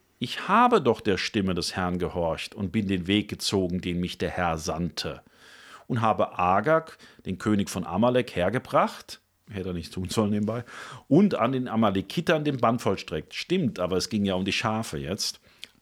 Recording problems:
none

